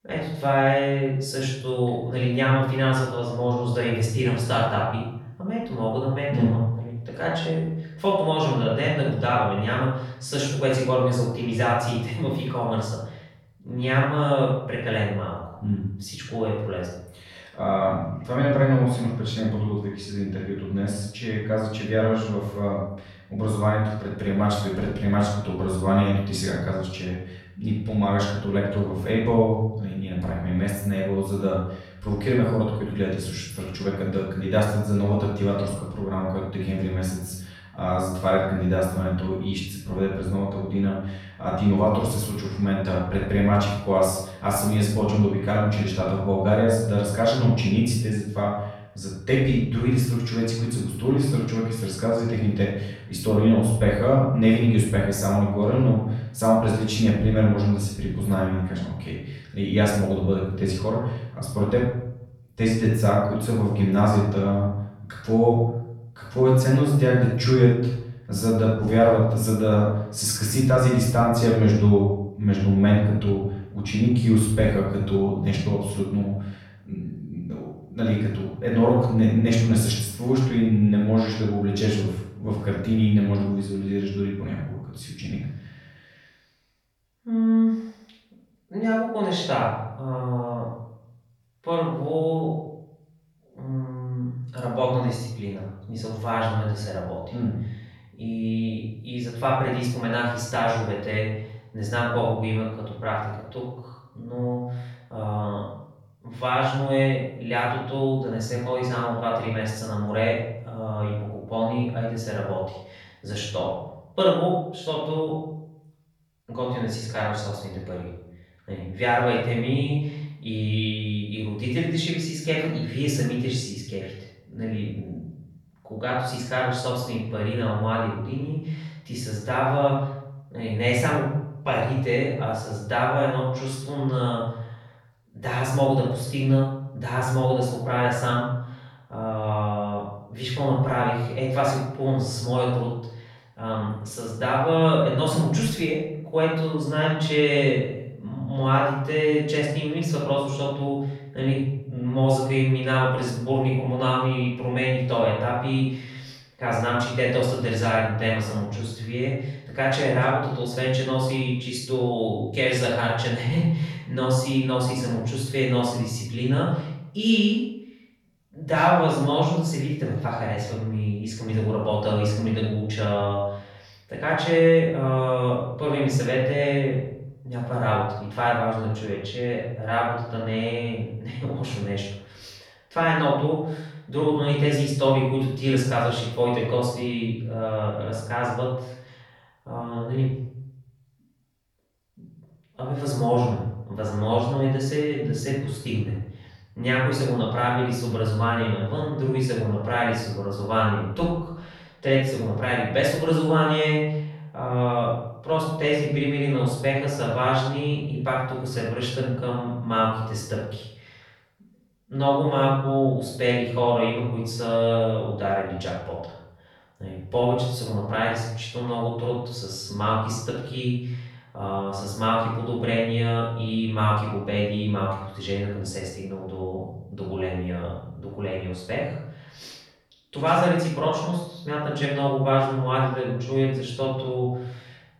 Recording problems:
off-mic speech; far
room echo; noticeable; dies away in 0.8 s

